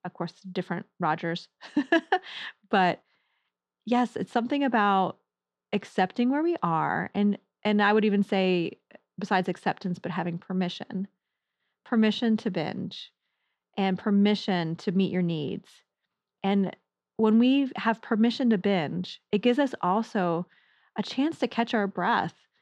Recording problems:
muffled; slightly; fading above 2.5 kHz

